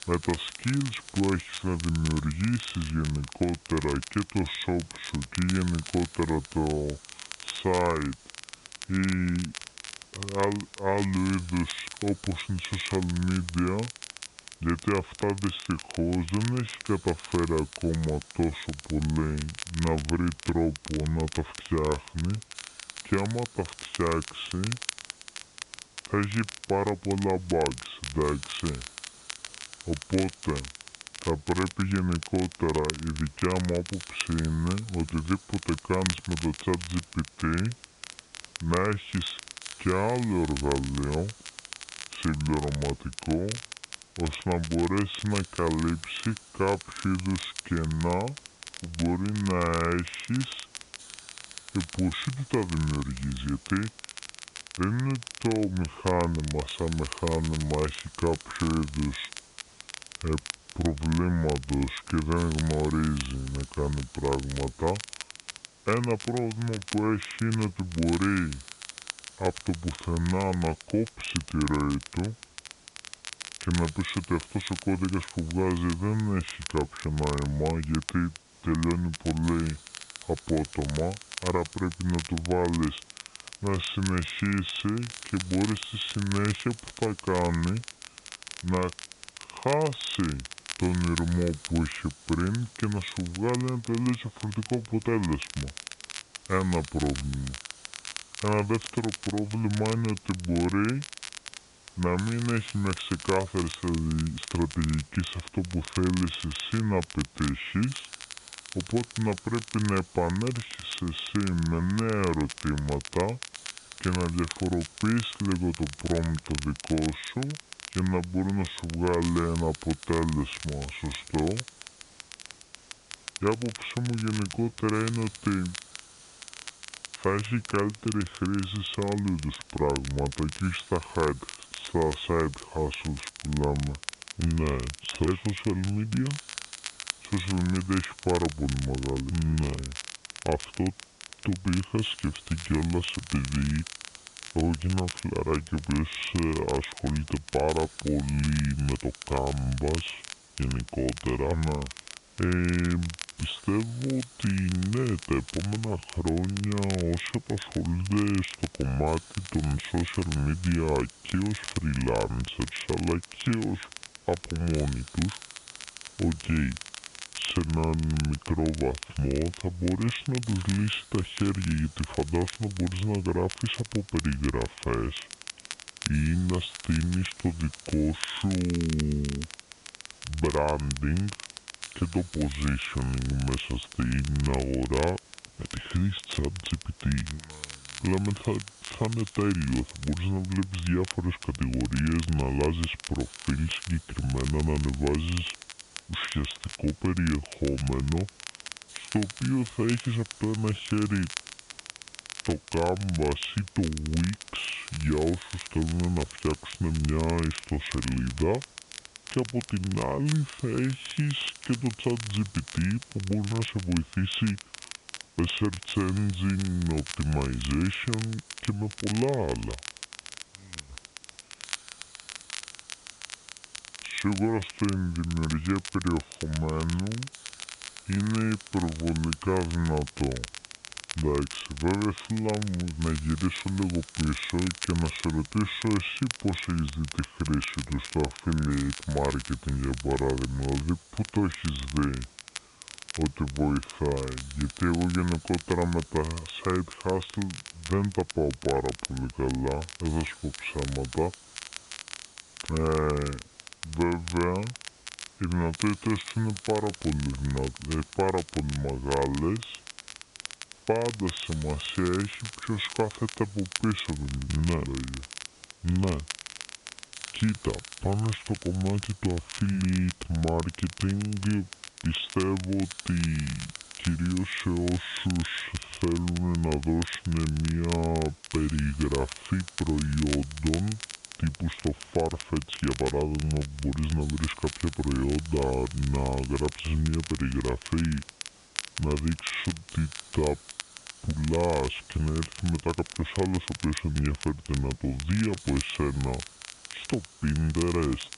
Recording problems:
high frequencies cut off; severe; nothing above 4 kHz
wrong speed and pitch; too slow and too low; 0.7 times normal speed
crackle, like an old record; noticeable; 10 dB below the speech
hiss; faint; throughout; 20 dB below the speech

